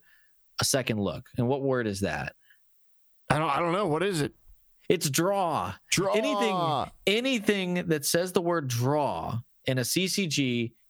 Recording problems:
squashed, flat; heavily

